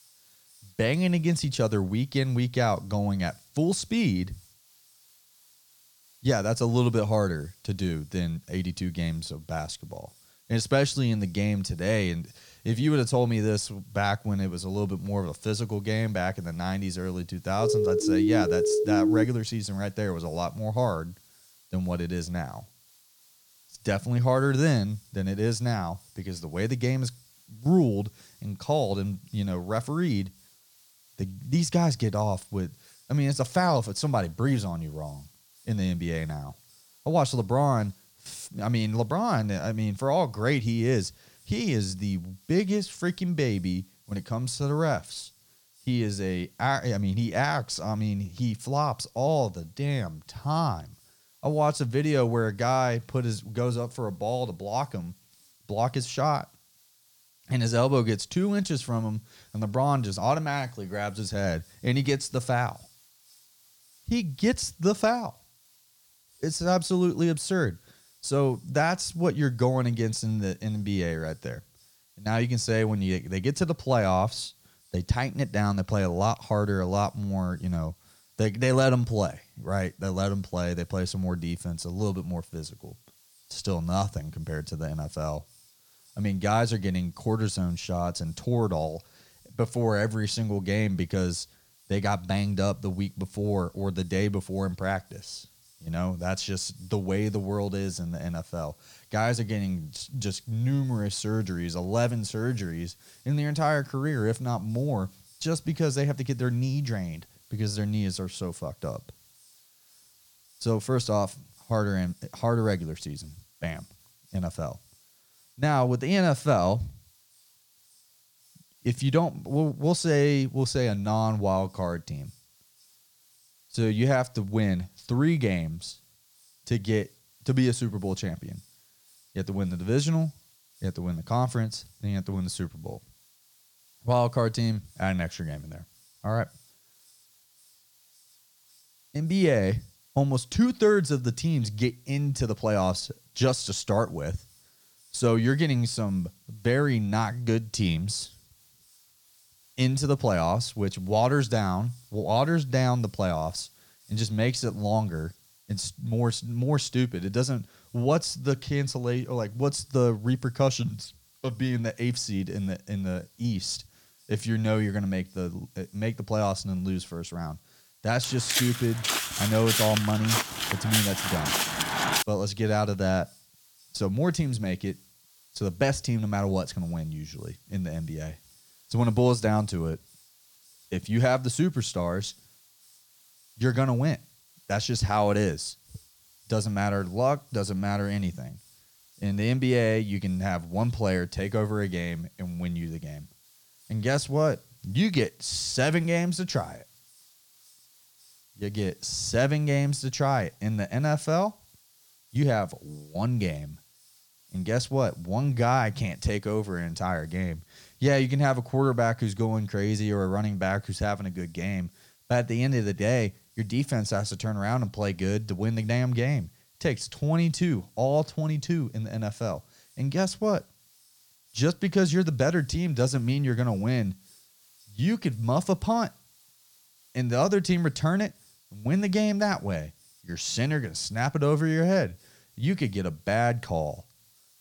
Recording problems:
hiss; faint; throughout; 30 dB below the speech
siren; loud; from 18 to 19 s; peak 5 dB above the speech
footsteps; loud; from 2:48 to 2:52; peak 3 dB above the speech

